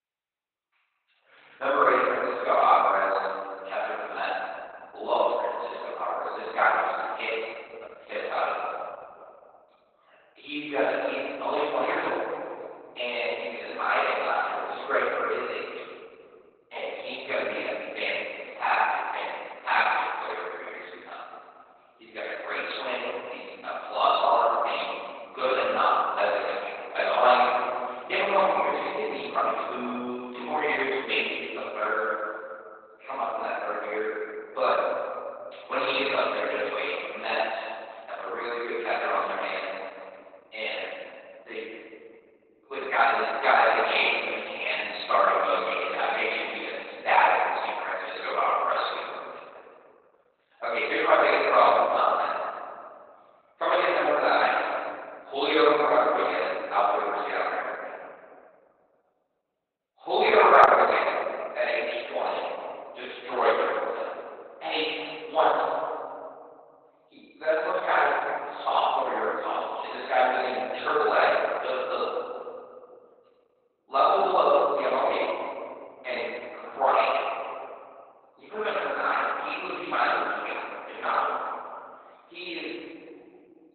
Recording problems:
room echo; strong; dies away in 2.6 s
off-mic speech; far
garbled, watery; badly; nothing above 4 kHz
thin; very; fading below 500 Hz

